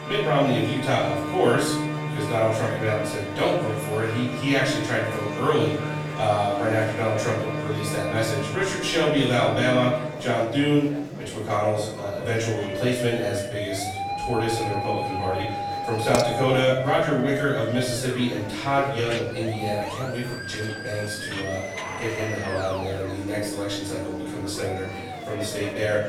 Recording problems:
off-mic speech; far
room echo; noticeable; dies away in 0.7 s
background music; loud; throughout; 7 dB below the speech
murmuring crowd; noticeable; throughout; 10 dB below the speech
clattering dishes; noticeable; at 16 s; peak 5 dB below the speech

